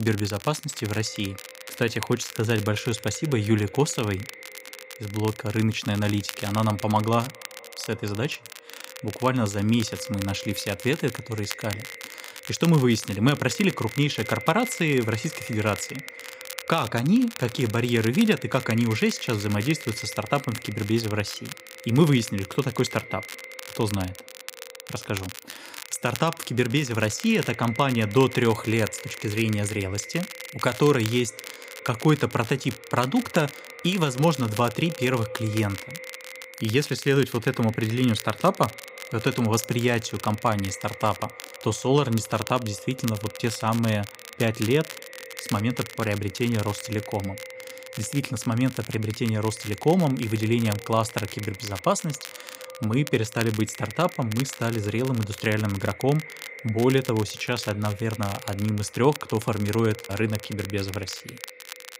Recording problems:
echo of what is said; noticeable; throughout; 210 ms later, 15 dB below the speech
crackle, like an old record; noticeable; 15 dB below the speech
abrupt cut into speech; at the start

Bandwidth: 15.5 kHz